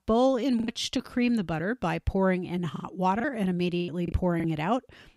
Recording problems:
choppy; very; at 0.5 s and from 3 to 4.5 s; 9% of the speech affected

